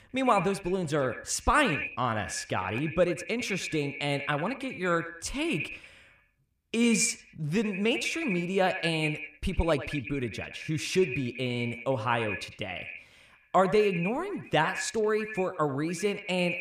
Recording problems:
echo of what is said; strong; throughout; 100 ms later, 8 dB below the speech

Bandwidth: 15 kHz